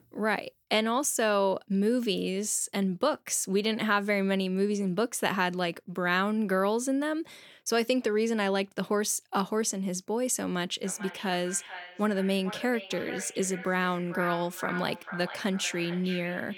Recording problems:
echo of what is said; noticeable; from 11 s on; 440 ms later, 10 dB below the speech

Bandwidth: 18 kHz